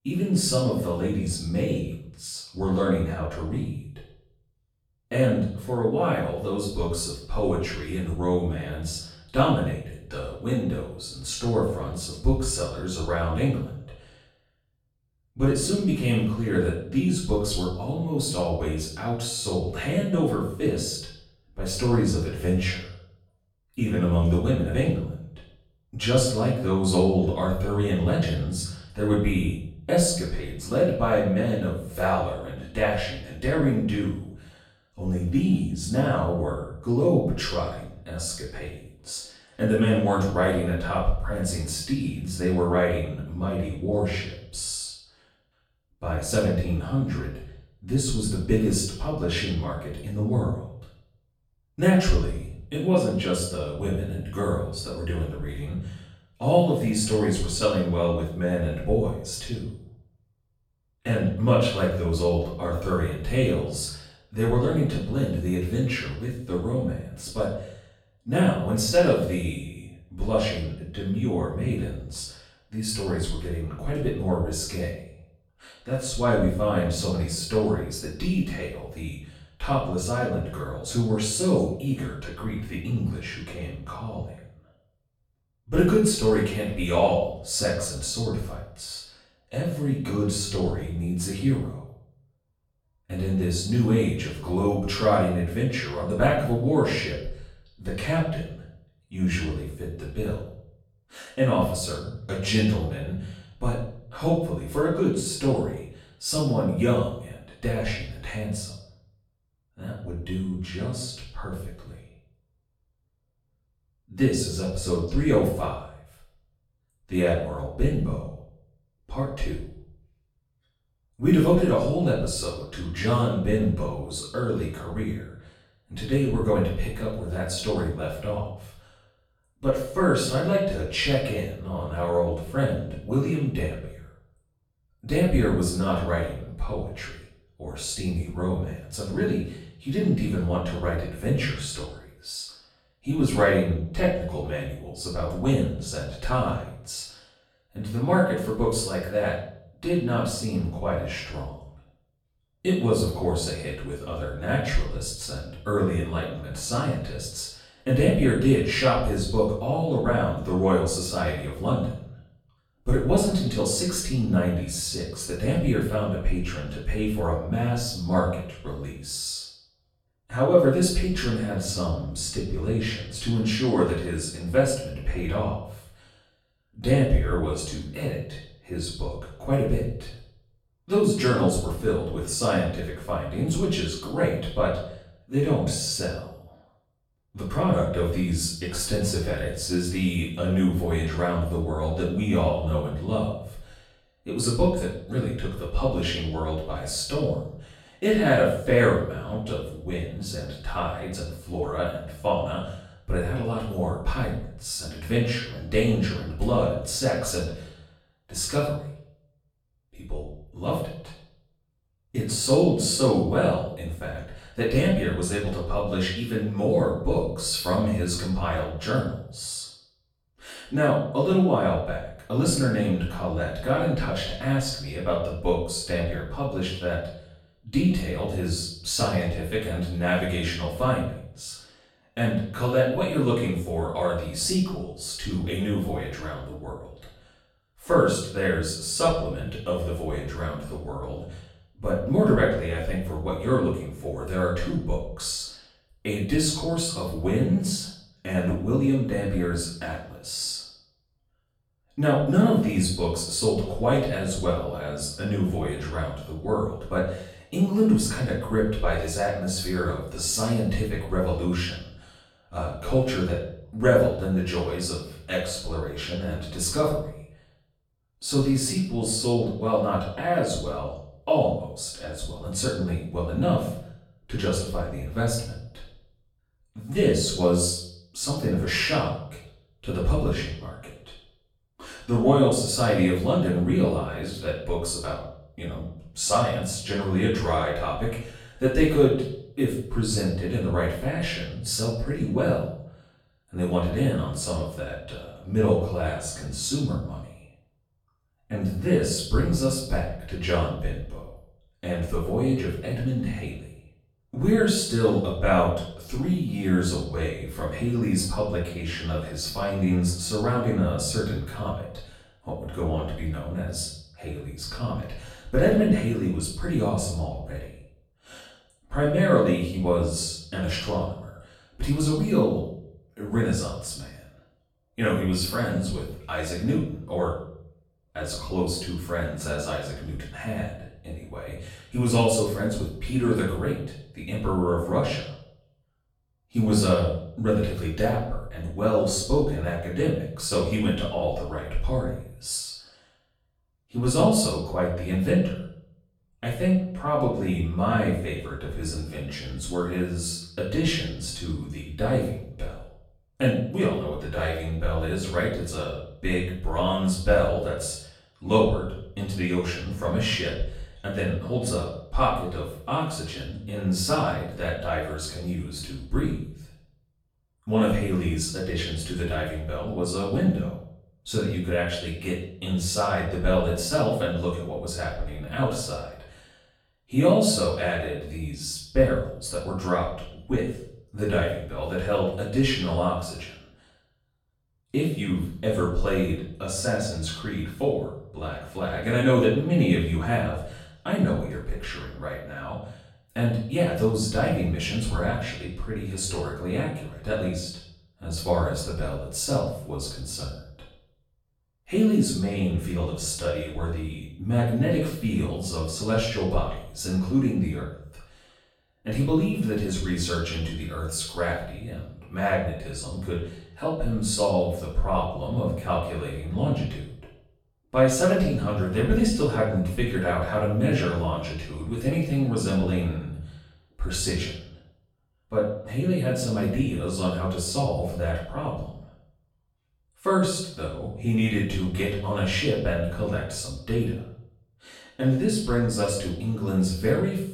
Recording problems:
off-mic speech; far
room echo; noticeable; dies away in 0.6 s

